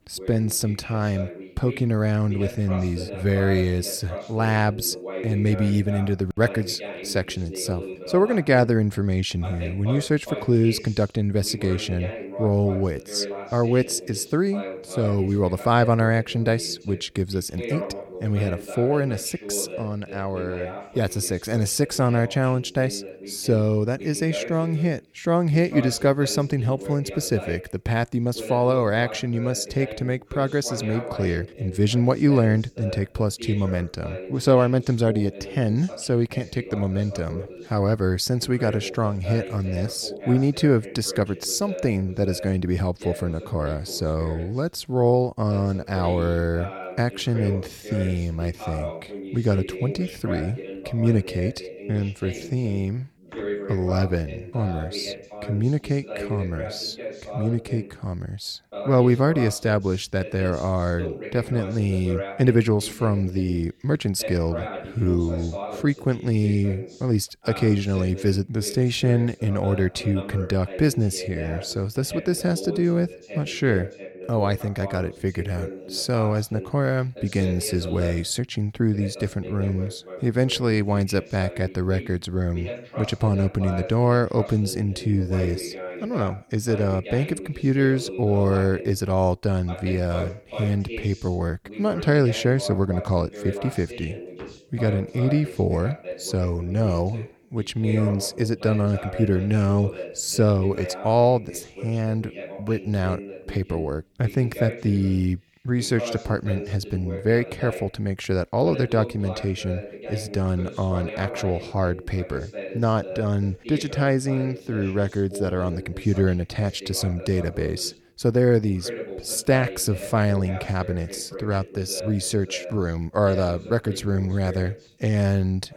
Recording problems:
voice in the background; noticeable; throughout; 10 dB below the speech

